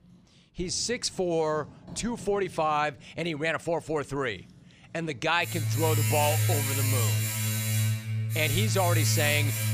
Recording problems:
household noises; very loud; throughout; 2 dB above the speech

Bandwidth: 15 kHz